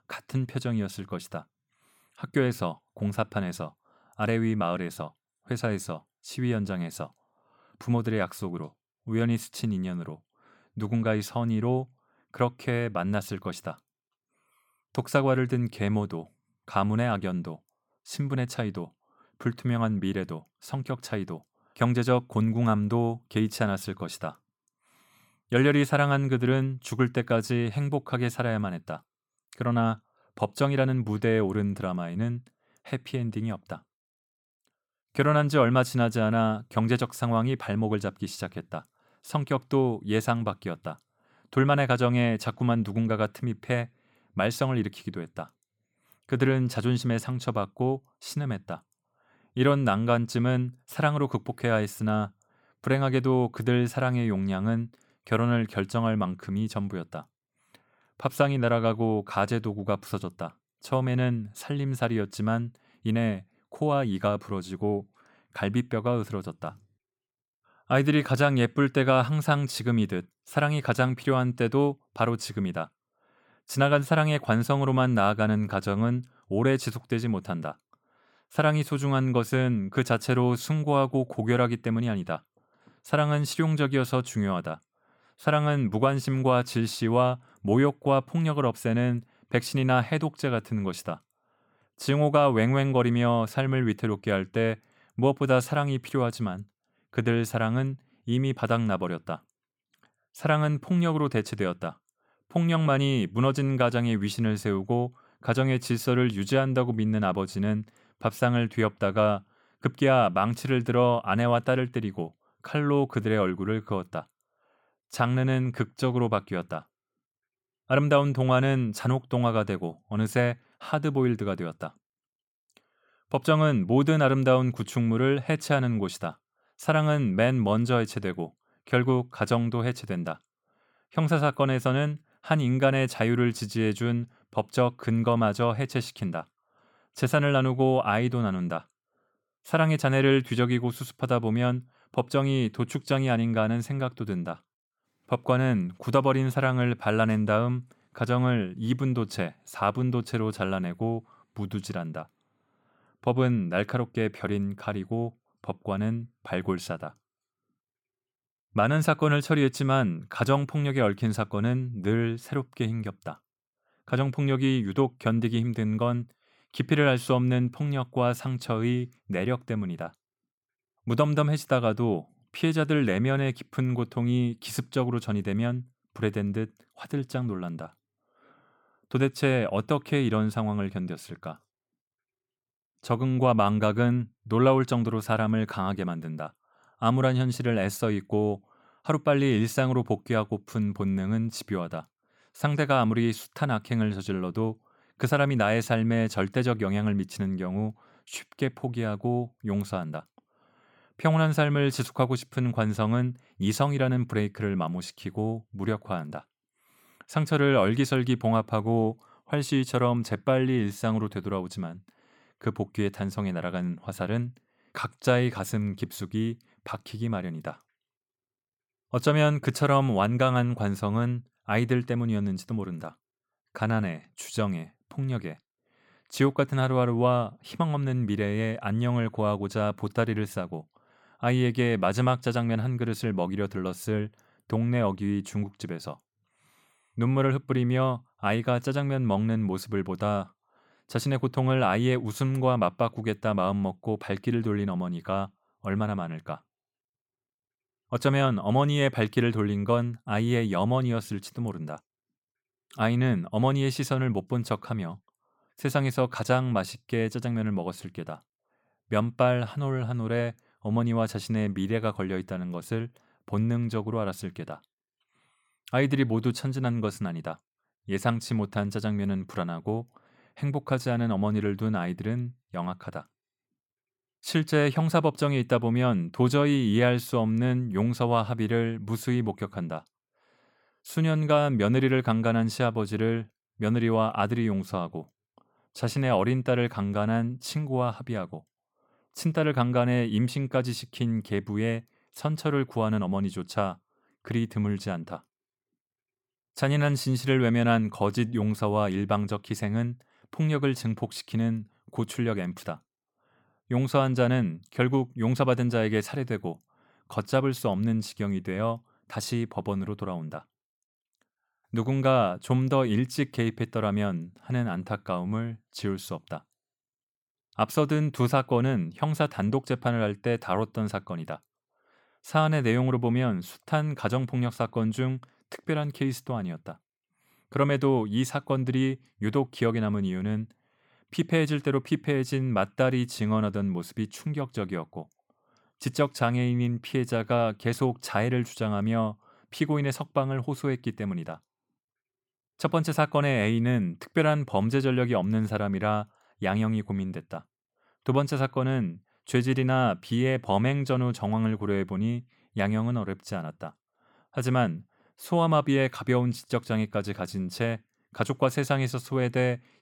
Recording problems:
none

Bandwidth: 17.5 kHz